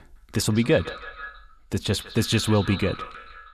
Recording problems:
echo of what is said; noticeable; throughout; 160 ms later, 15 dB below the speech

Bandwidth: 13.5 kHz